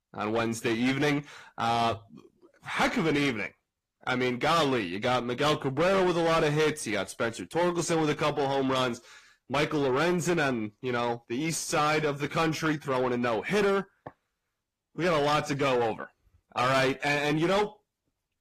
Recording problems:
distortion; heavy; 6 dB below the speech
garbled, watery; slightly; nothing above 14.5 kHz

